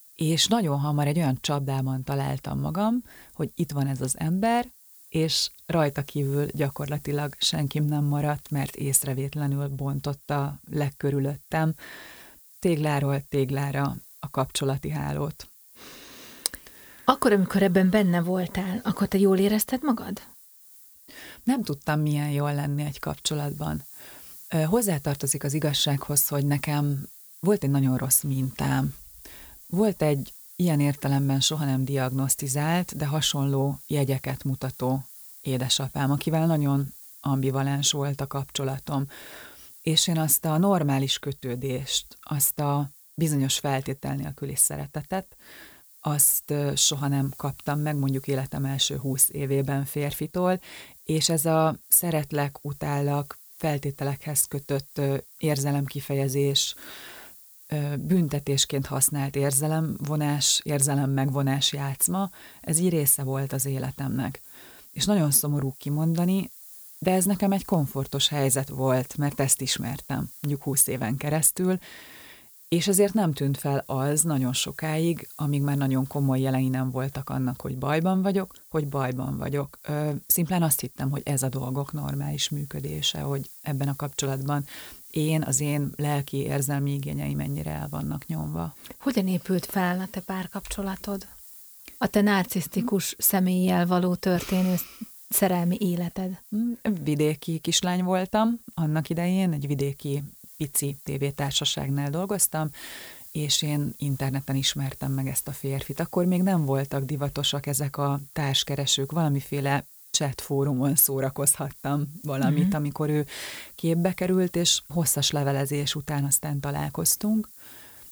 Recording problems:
hiss; noticeable; throughout; 20 dB below the speech

